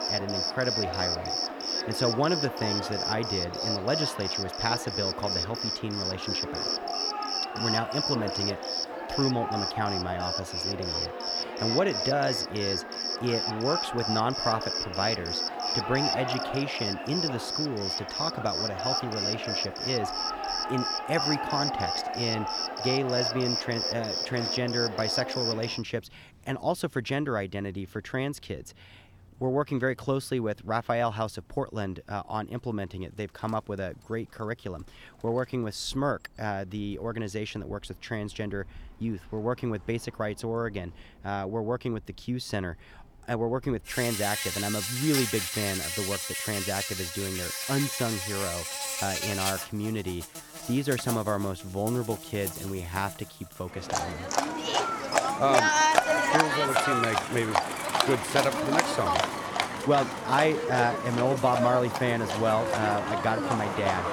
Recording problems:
animal sounds; very loud; throughout; 2 dB above the speech

